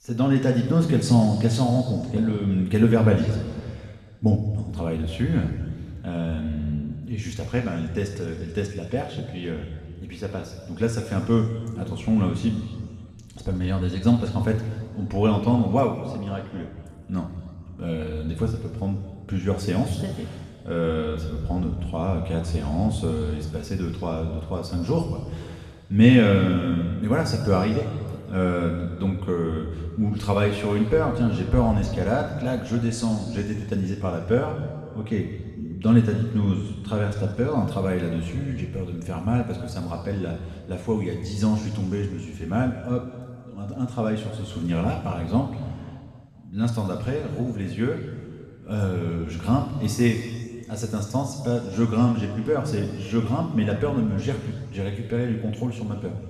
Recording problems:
off-mic speech; far
room echo; noticeable; dies away in 1.8 s

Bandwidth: 13.5 kHz